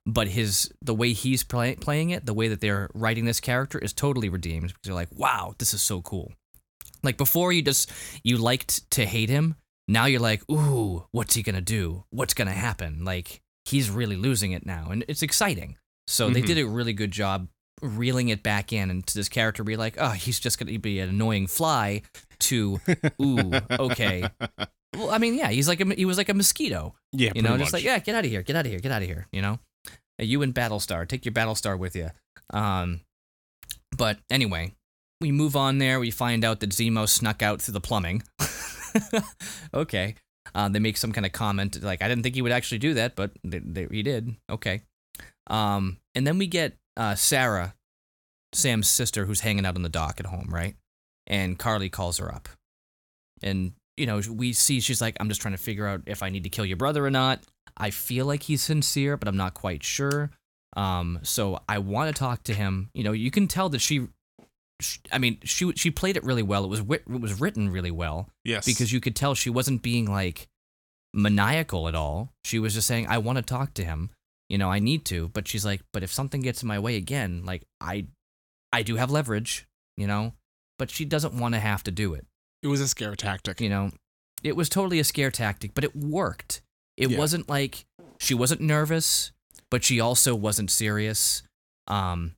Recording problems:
none

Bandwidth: 17 kHz